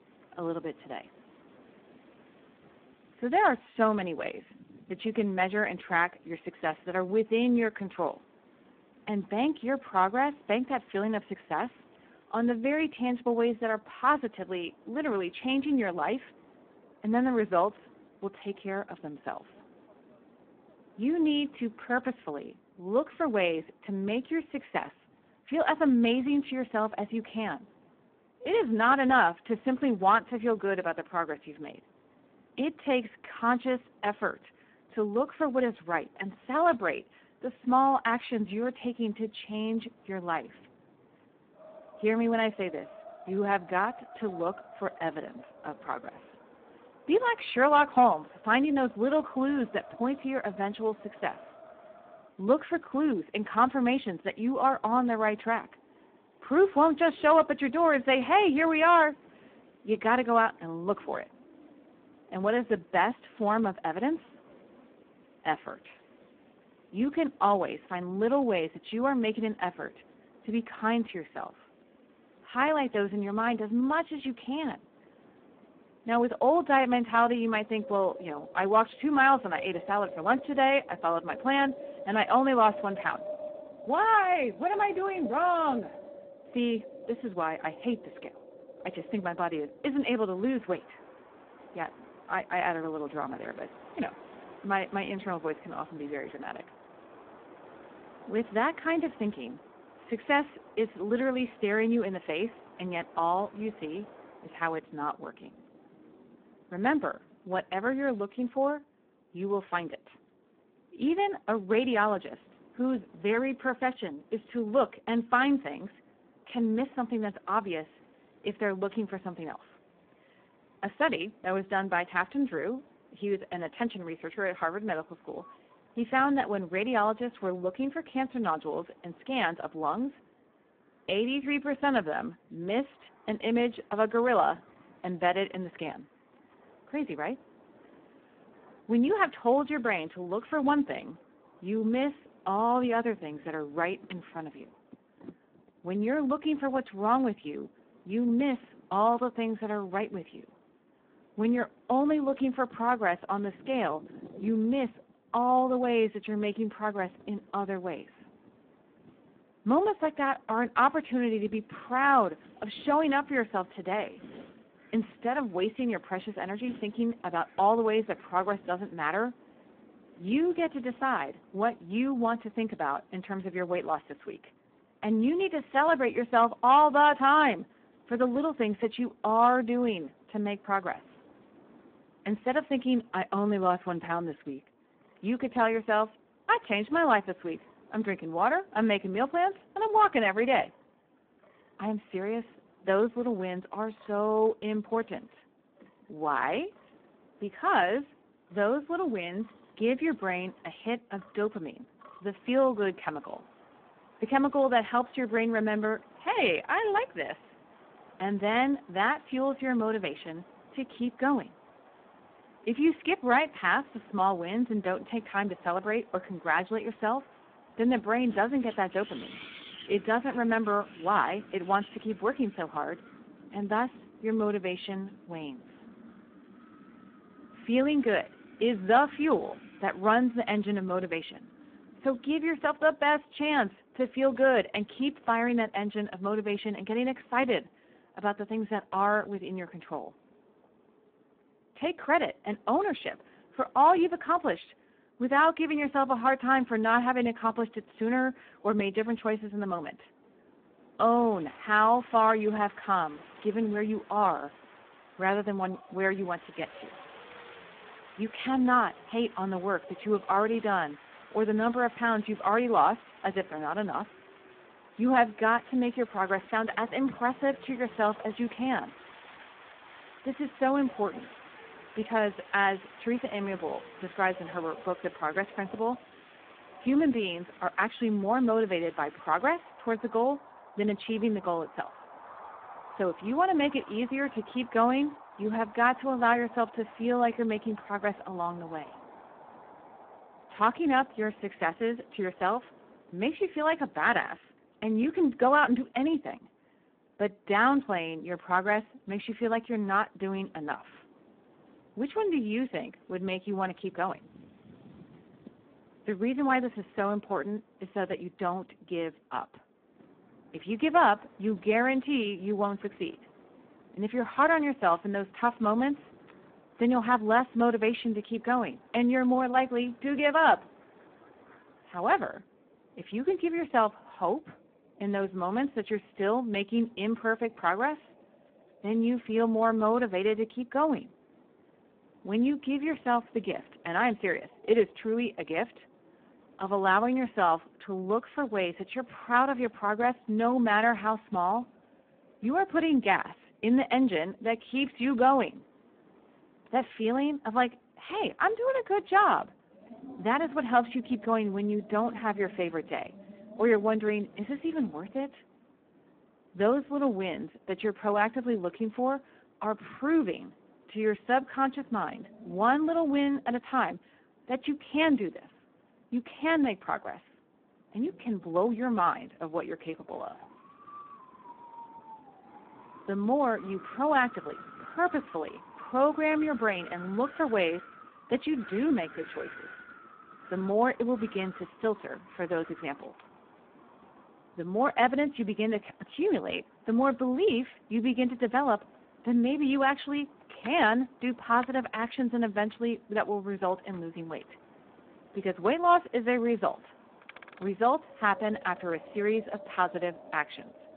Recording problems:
phone-call audio; poor line
wind in the background; faint; throughout; 25 dB below the speech

